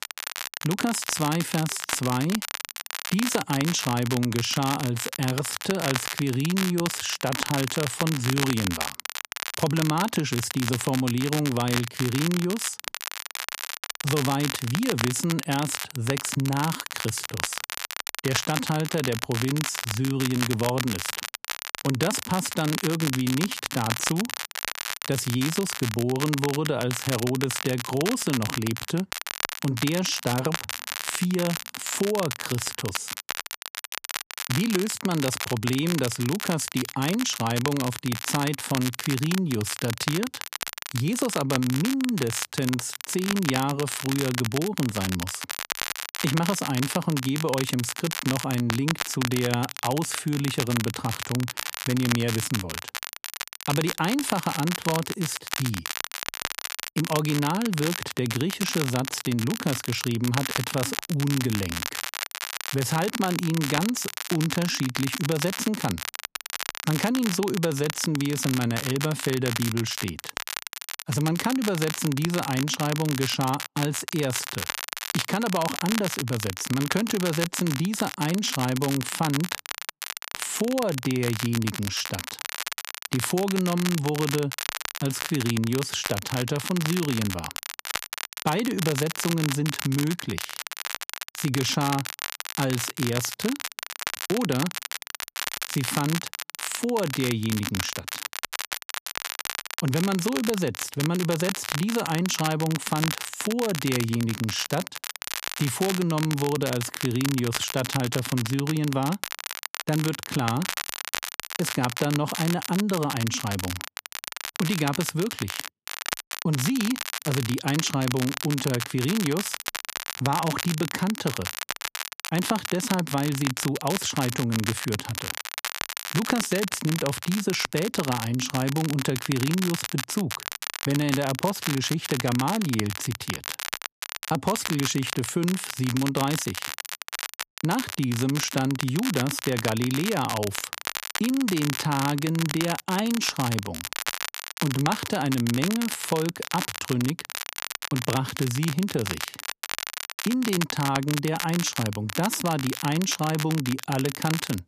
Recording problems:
crackle, like an old record; loud; 5 dB below the speech

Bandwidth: 14.5 kHz